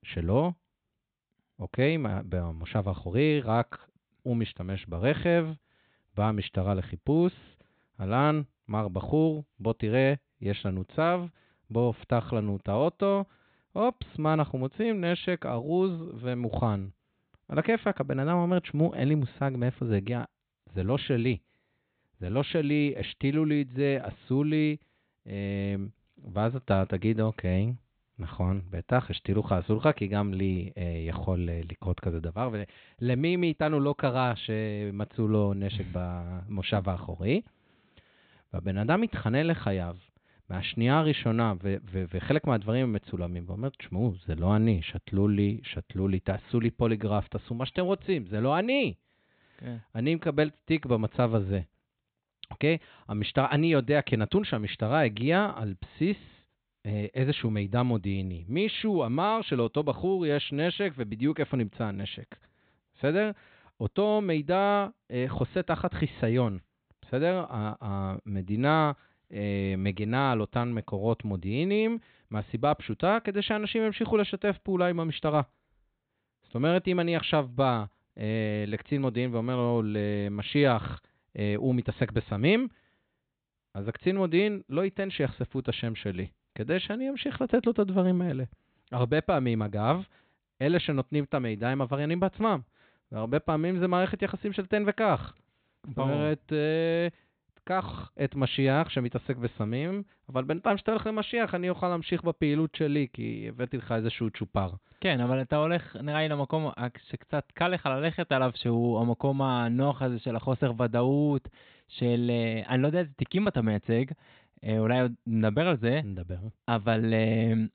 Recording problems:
high frequencies cut off; severe; nothing above 4 kHz

